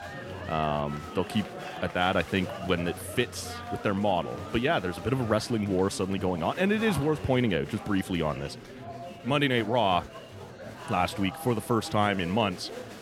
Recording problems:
murmuring crowd; noticeable; throughout; 10 dB below the speech

